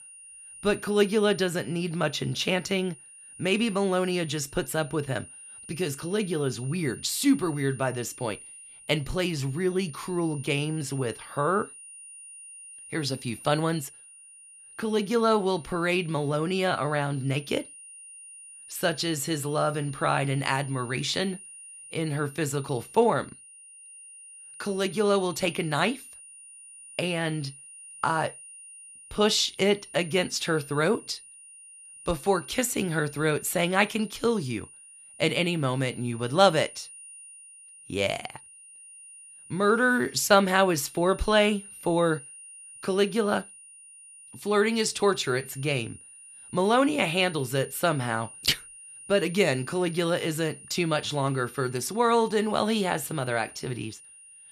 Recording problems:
high-pitched whine; noticeable; throughout; 9.5 kHz, 15 dB below the speech

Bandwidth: 14.5 kHz